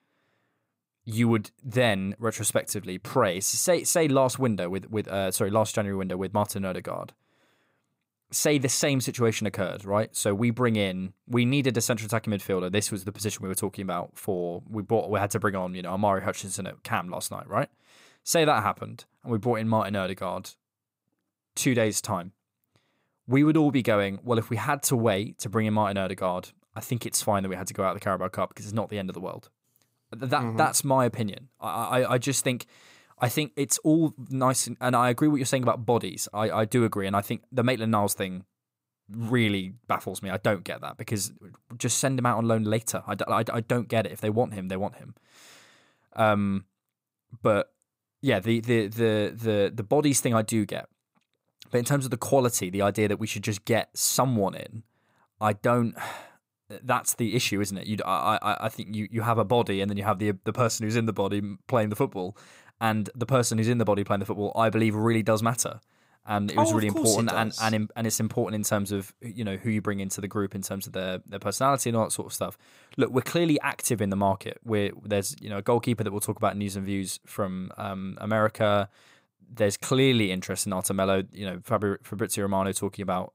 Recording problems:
none

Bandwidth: 15.5 kHz